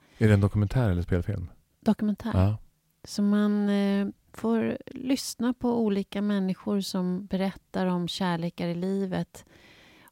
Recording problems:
none

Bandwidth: 16 kHz